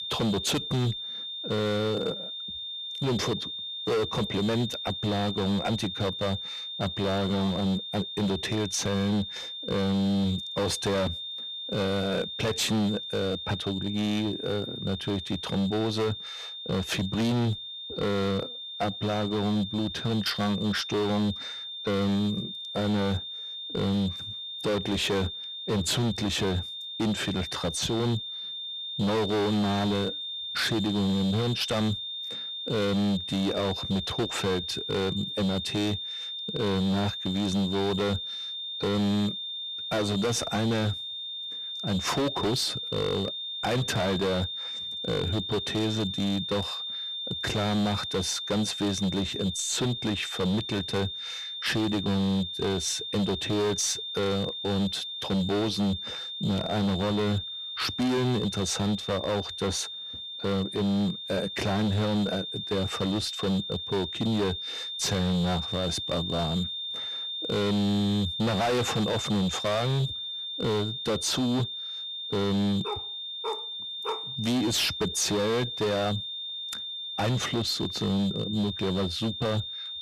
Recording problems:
distortion; heavy; 17% of the sound clipped
high-pitched whine; loud; throughout; 3.5 kHz, 5 dB below the speech
dog barking; noticeable; from 1:13 to 1:14; peak 8 dB below the speech

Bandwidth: 14.5 kHz